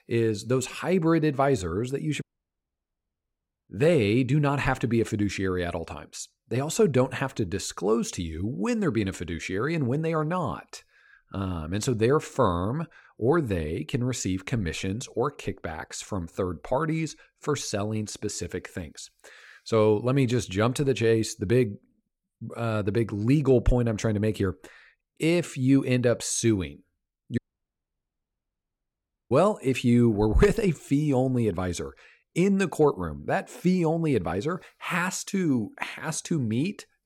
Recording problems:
audio cutting out; at 2 s for 1.5 s and at 27 s for 2 s

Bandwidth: 17 kHz